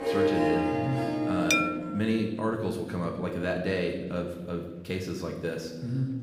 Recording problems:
room echo; slight; dies away in 1 s
off-mic speech; somewhat distant
background music; very loud; until 1.5 s; 3 dB above the speech
murmuring crowd; faint; throughout; 25 dB below the speech
clattering dishes; loud; at 1.5 s; peak 6 dB above the speech

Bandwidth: 15.5 kHz